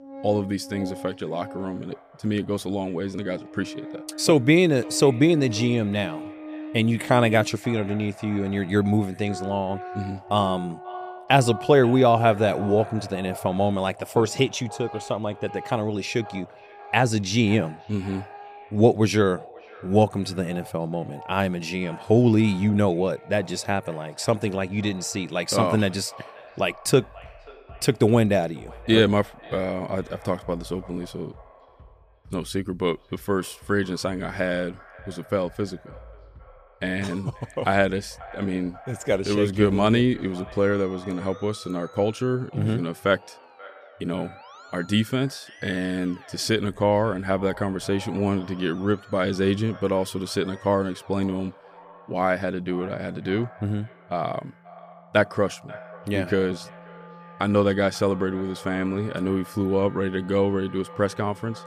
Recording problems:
echo of what is said; faint; throughout; 540 ms later, 20 dB below the speech
background music; noticeable; throughout; 20 dB below the speech

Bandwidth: 15 kHz